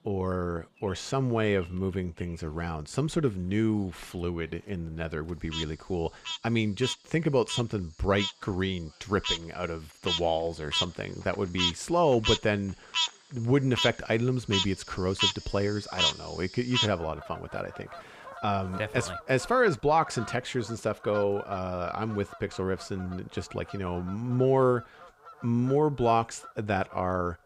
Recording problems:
animal sounds; loud; throughout; 3 dB below the speech

